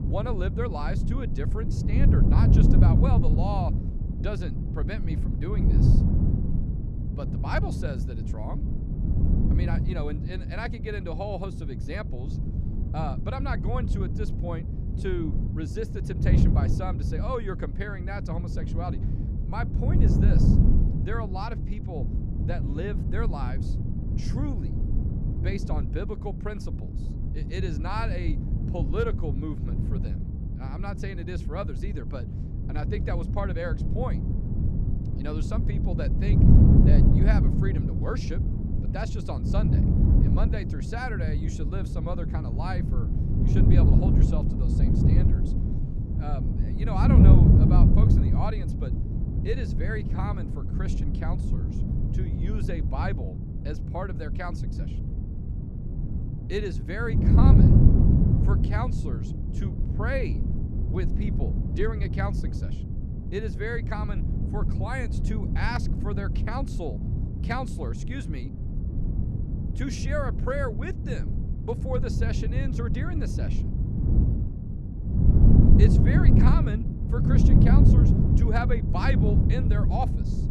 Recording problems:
wind noise on the microphone; heavy; 1 dB below the speech

